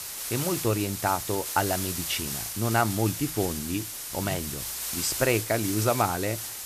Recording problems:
hiss; loud; throughout; 3 dB below the speech

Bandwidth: 14.5 kHz